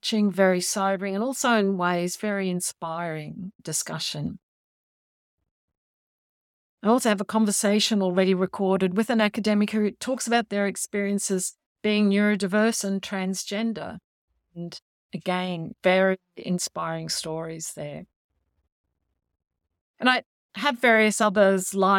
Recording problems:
abrupt cut into speech; at the end

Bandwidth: 17.5 kHz